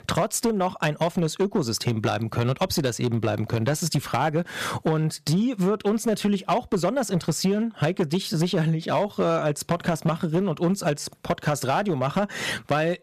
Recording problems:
distortion; slight; 7% of the sound clipped
squashed, flat; somewhat

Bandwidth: 14.5 kHz